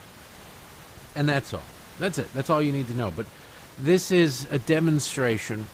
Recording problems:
garbled, watery; slightly; nothing above 15.5 kHz
hiss; faint; throughout; 20 dB below the speech

